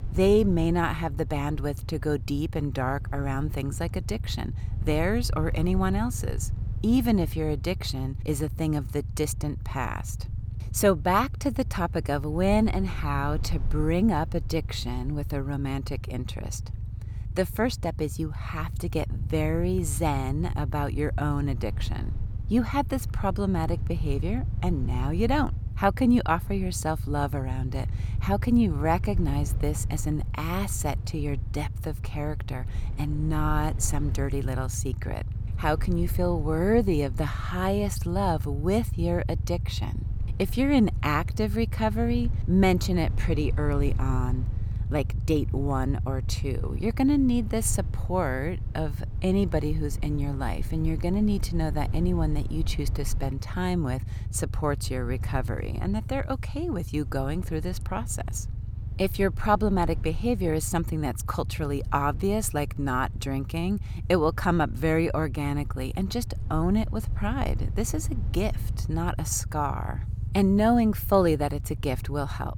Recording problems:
low rumble; noticeable; throughout; 20 dB below the speech

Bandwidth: 17 kHz